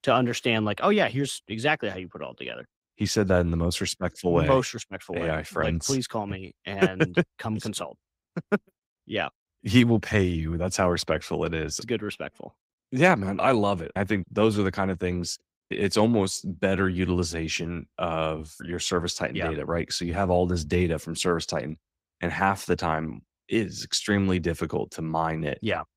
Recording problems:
garbled, watery; slightly; nothing above 15.5 kHz

